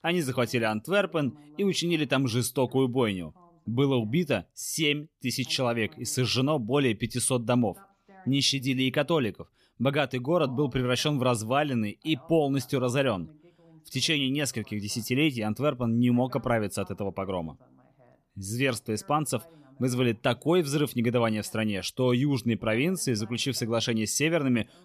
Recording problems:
voice in the background; faint; throughout; 30 dB below the speech

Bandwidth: 14.5 kHz